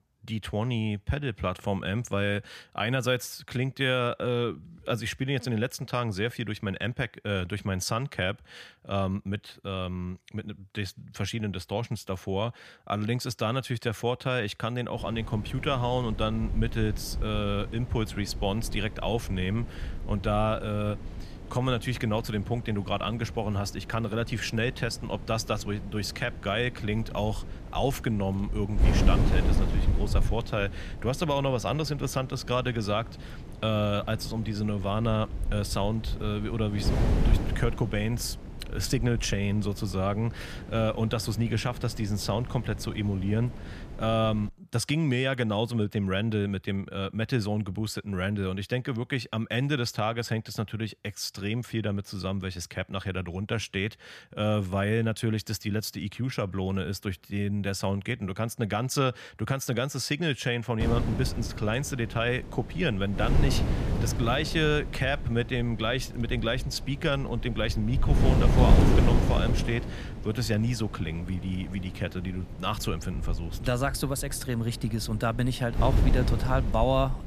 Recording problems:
wind noise on the microphone; heavy; from 15 to 44 s and from 1:01 on; 10 dB below the speech

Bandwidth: 14.5 kHz